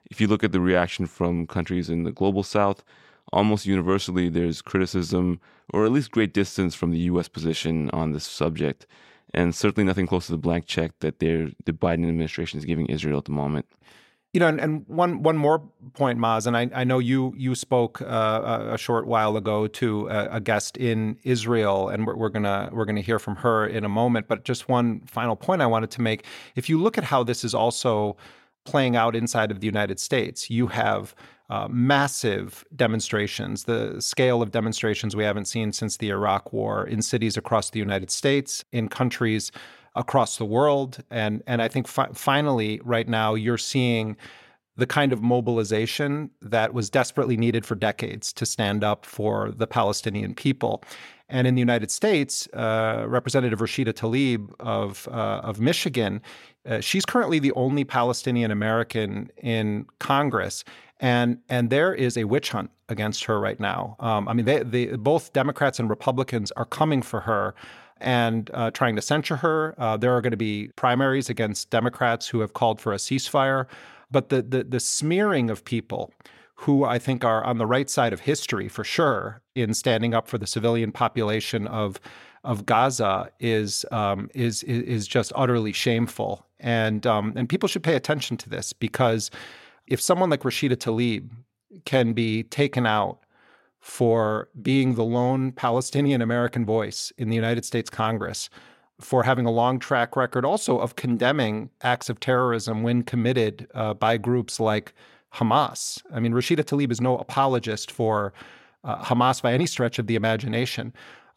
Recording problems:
none

